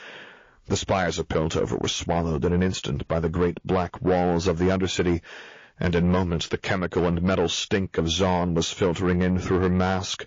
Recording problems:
distortion; slight; 10 dB below the speech
garbled, watery; slightly

